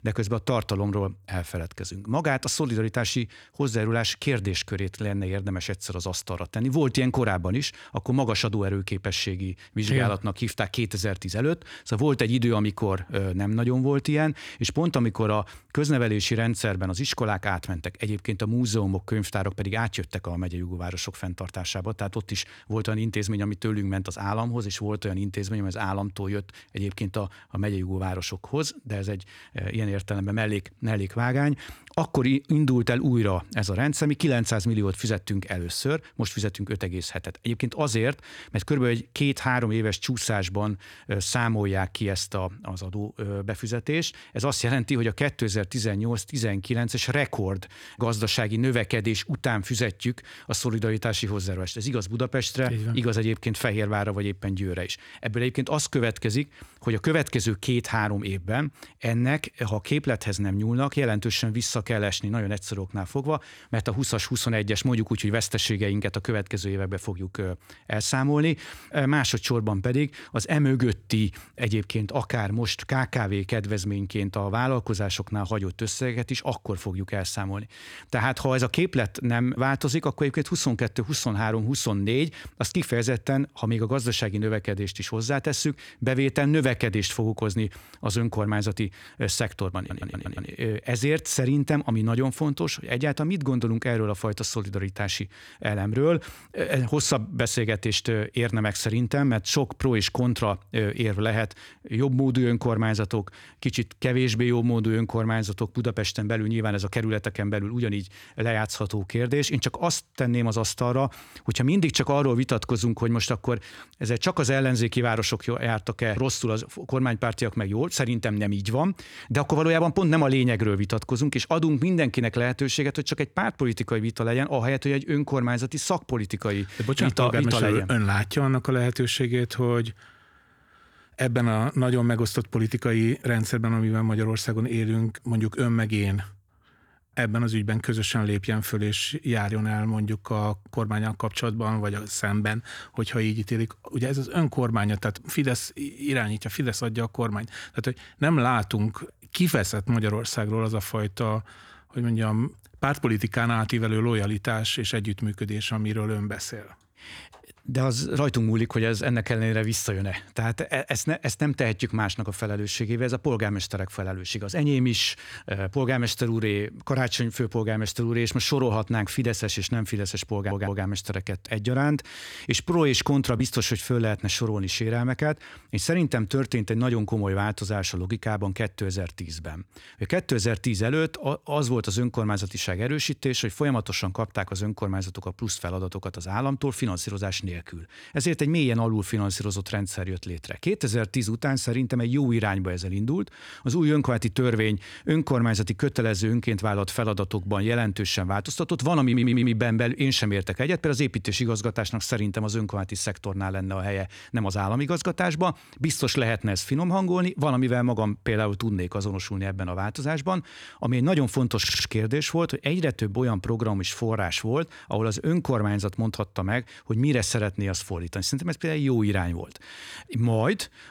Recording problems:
audio stuttering; 4 times, first at 1:30

